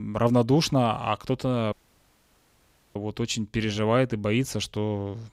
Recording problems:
abrupt cut into speech; at the start
audio cutting out; at 1.5 s for 1 s

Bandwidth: 15.5 kHz